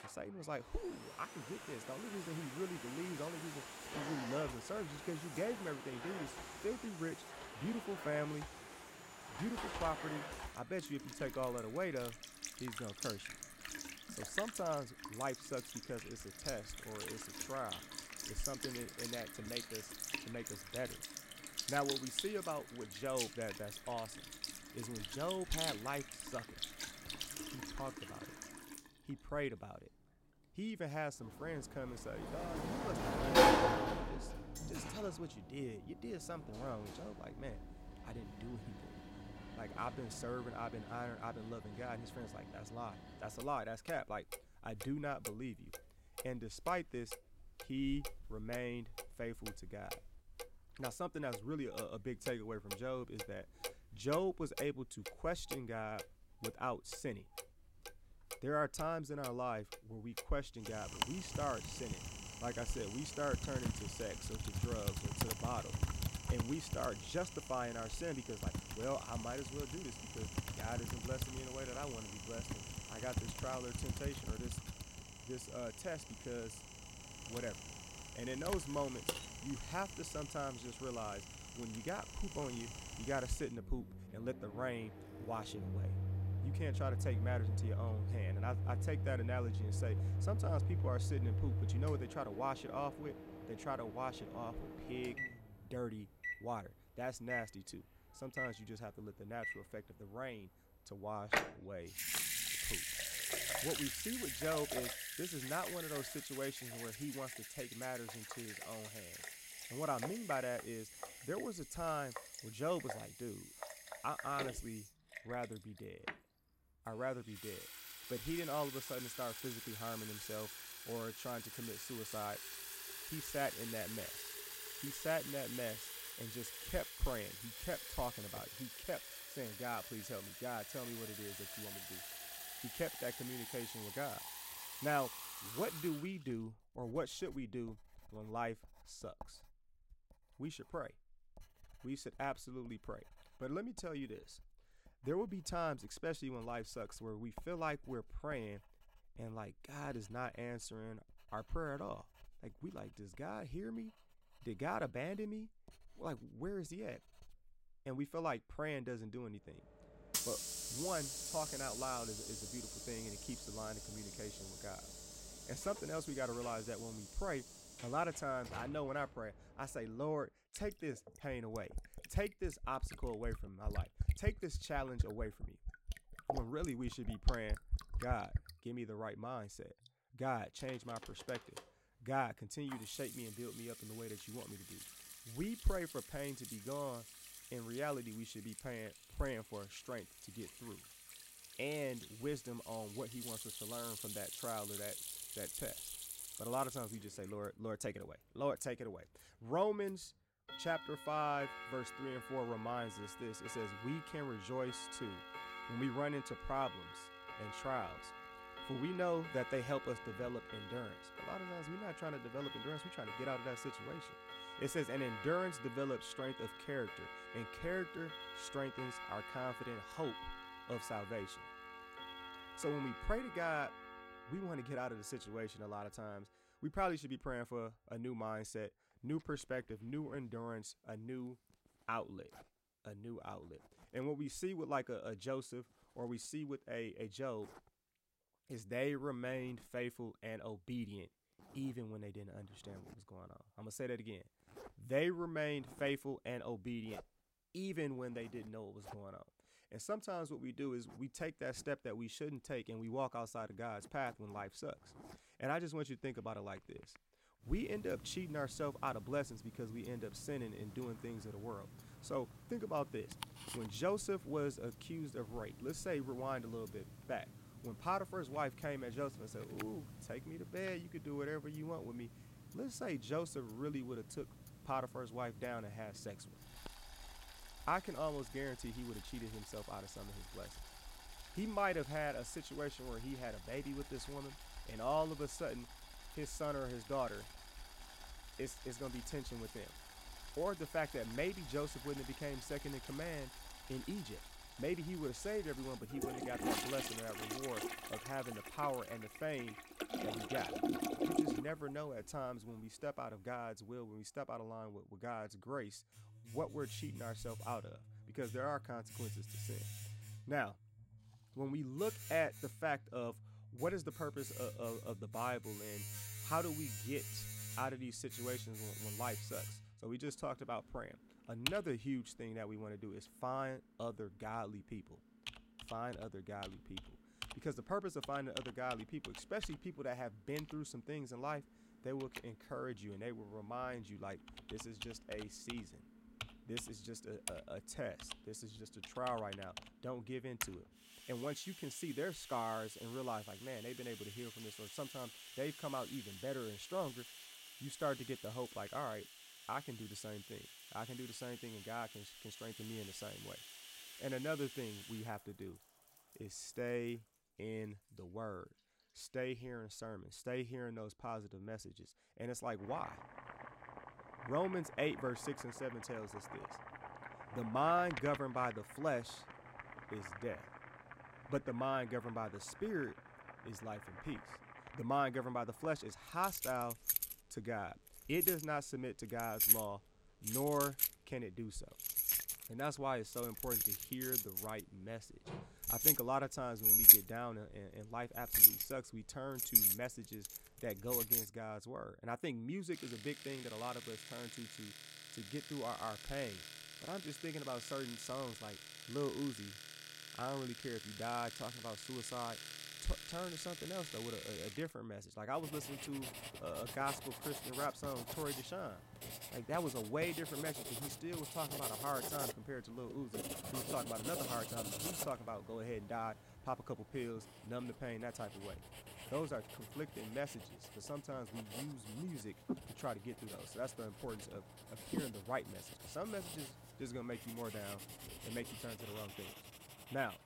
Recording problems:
household noises; very loud; throughout; 1 dB above the speech

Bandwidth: 16 kHz